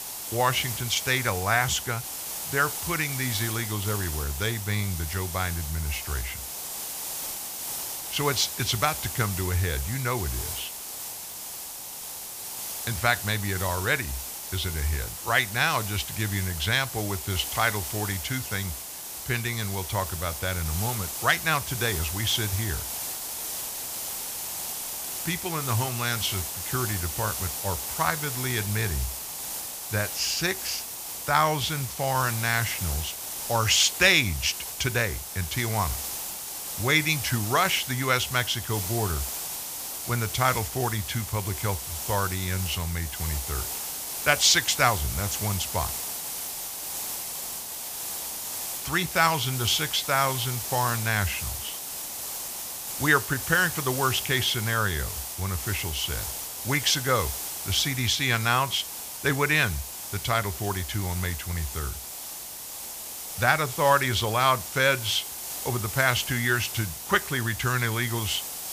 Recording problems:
hiss; loud; throughout; 5 dB below the speech

